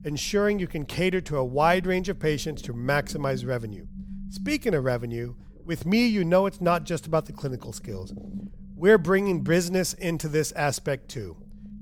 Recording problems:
low rumble; faint; throughout; 25 dB below the speech

